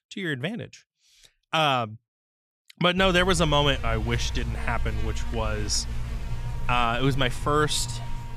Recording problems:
electrical hum; very faint; from 3 s on; 60 Hz, 20 dB below the speech

